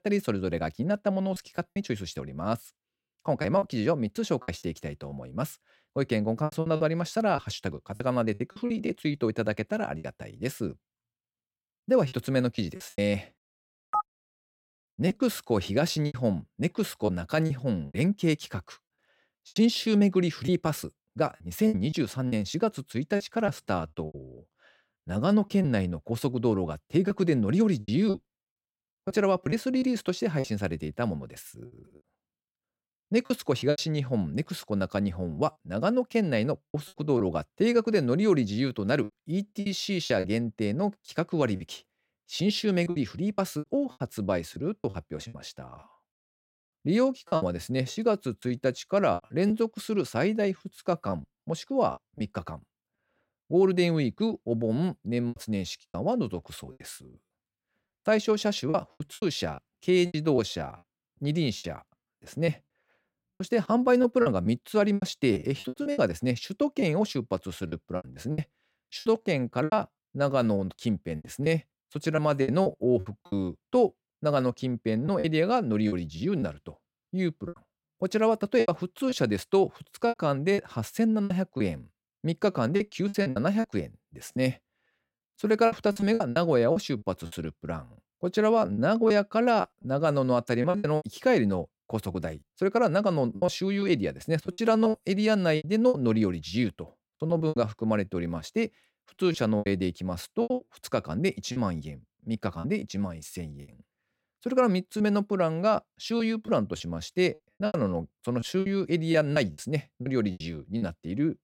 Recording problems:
choppy; very; 9% of the speech affected

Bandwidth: 16.5 kHz